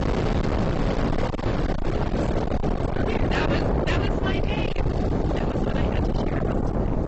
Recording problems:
distortion; heavy; 6 dB below the speech
garbled, watery; badly; nothing above 7.5 kHz
rain or running water; very loud; throughout; 3 dB above the speech
wind noise on the microphone; heavy; 3 dB above the speech

